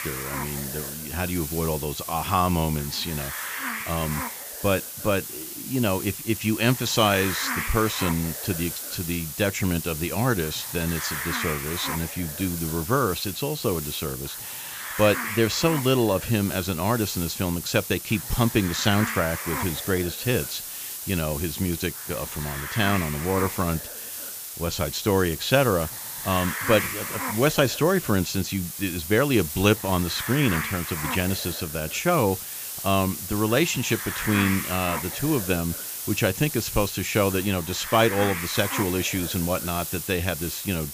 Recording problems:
high frequencies cut off; noticeable; nothing above 7.5 kHz
hiss; loud; throughout; 5 dB below the speech

